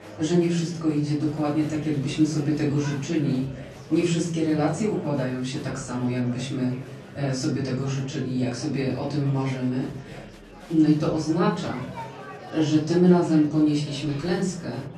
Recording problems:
off-mic speech; far
room echo; noticeable; dies away in 0.5 s
murmuring crowd; noticeable; throughout; 15 dB below the speech

